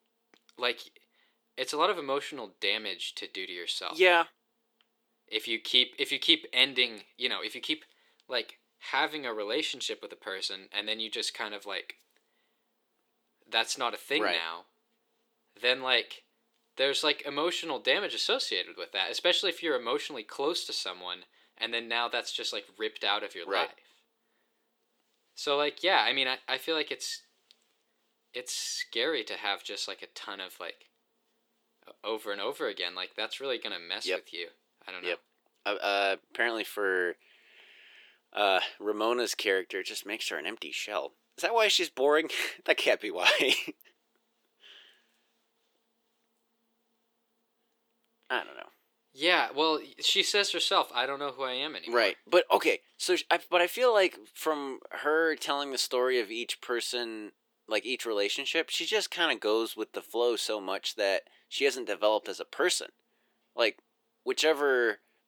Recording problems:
thin; somewhat; fading below 350 Hz

